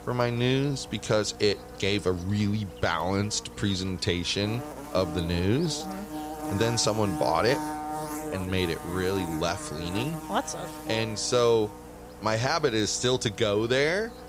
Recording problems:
electrical hum; noticeable; throughout; 60 Hz, 10 dB below the speech

